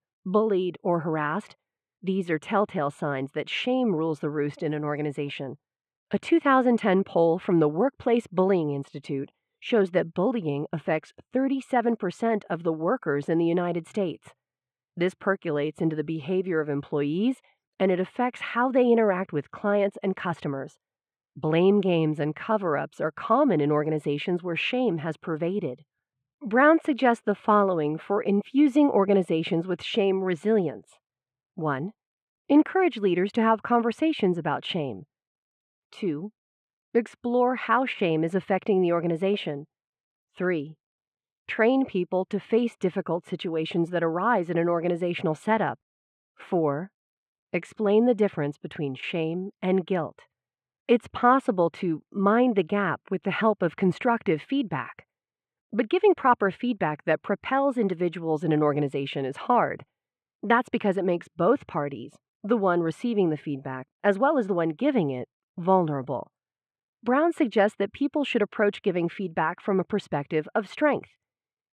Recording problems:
muffled; very; fading above 2 kHz

